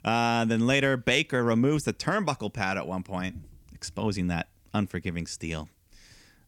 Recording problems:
none

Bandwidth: 18 kHz